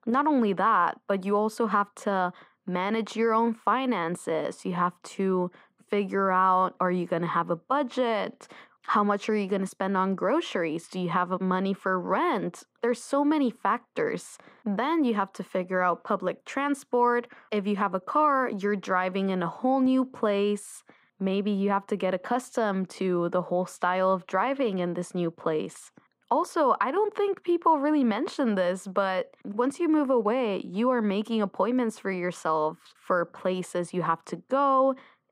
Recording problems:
muffled; very; fading above 3.5 kHz

